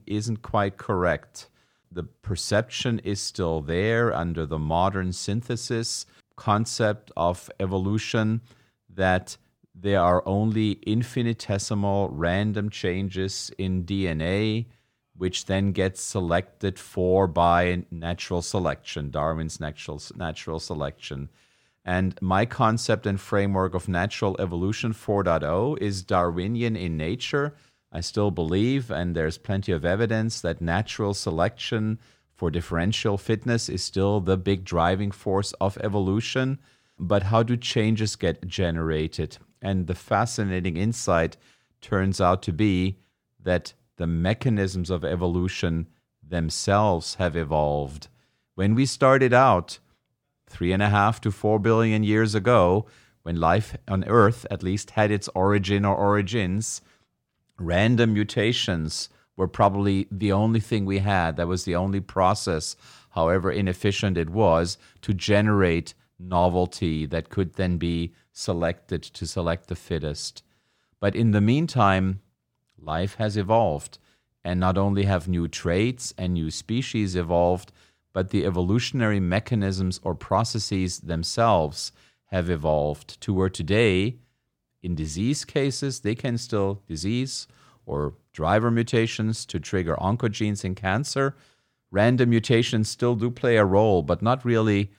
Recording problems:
none

